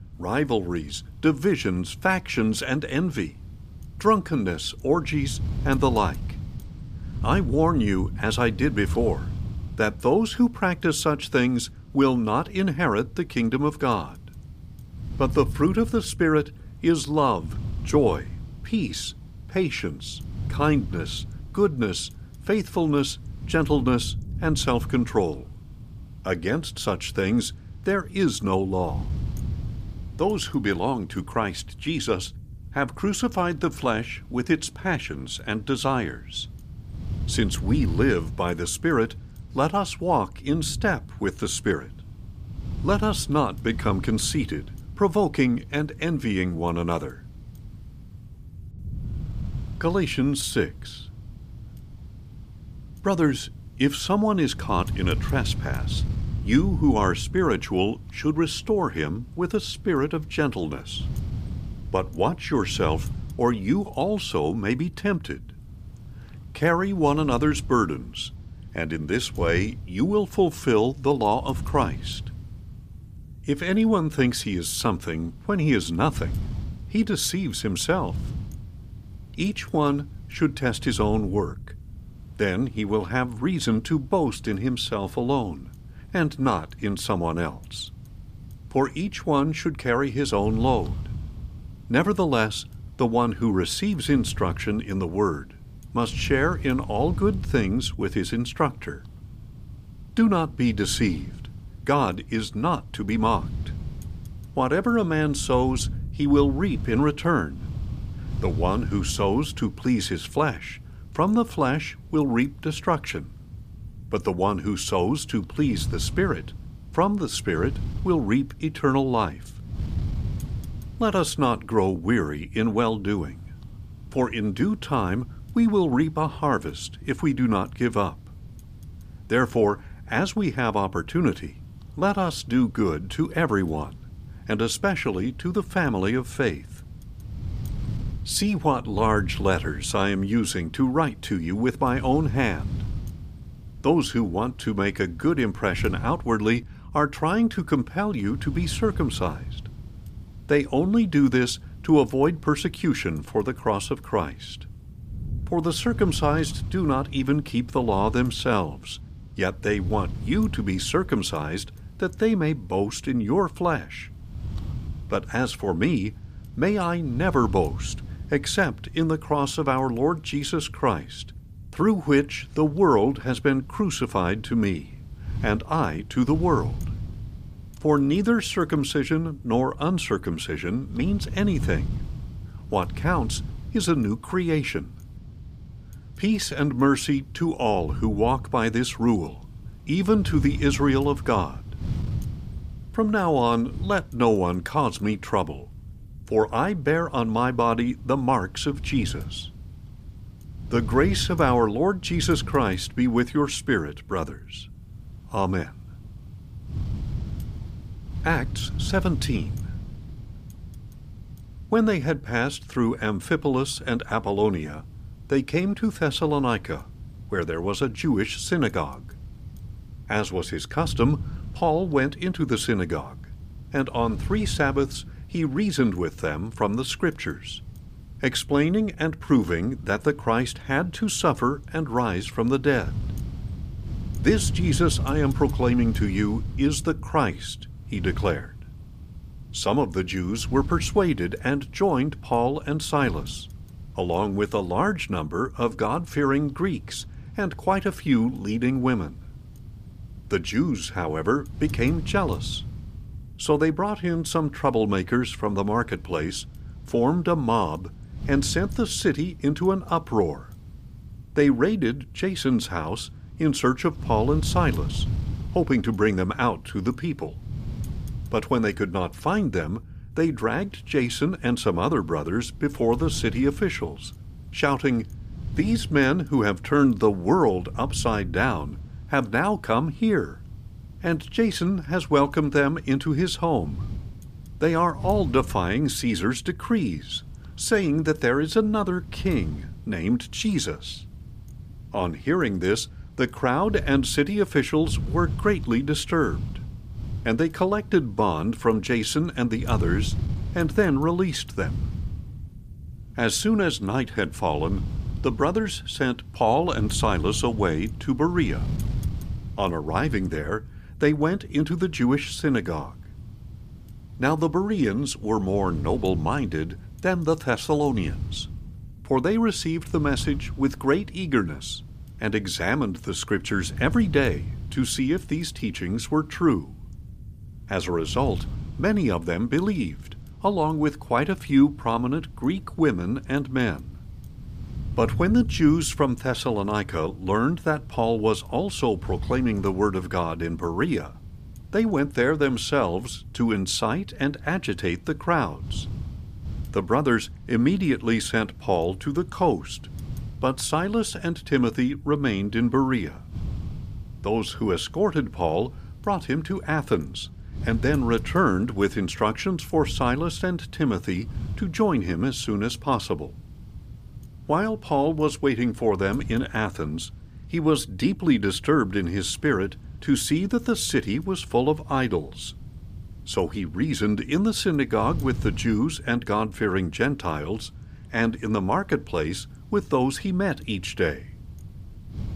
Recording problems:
wind noise on the microphone; occasional gusts; 25 dB below the speech

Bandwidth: 15 kHz